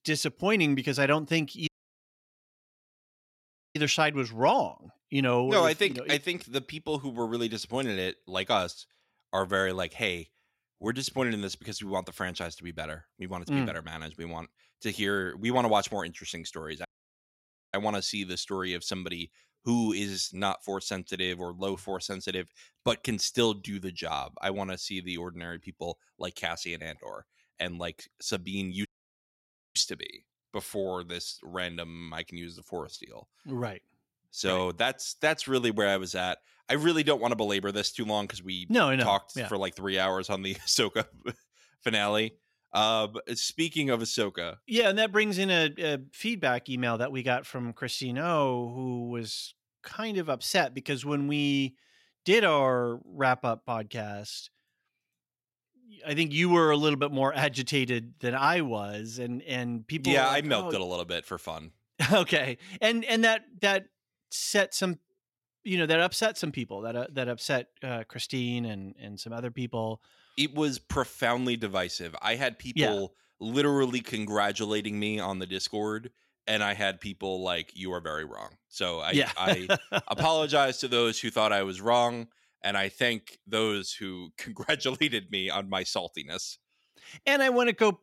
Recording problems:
audio cutting out; at 1.5 s for 2 s, at 17 s for 1 s and at 29 s for 1 s

